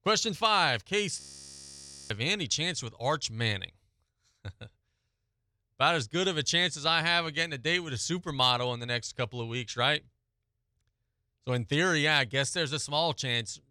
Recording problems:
audio freezing; at 1 s for 1 s

